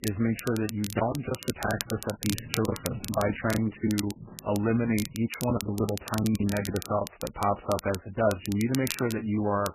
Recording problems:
garbled, watery; badly; nothing above 3 kHz
crackle, like an old record; noticeable; 10 dB below the speech
choppy; very; from 1 to 2 s, from 2.5 to 4 s and from 5.5 to 7 s; 15% of the speech affected
footsteps; noticeable; from 1.5 to 5 s; peak 10 dB below the speech

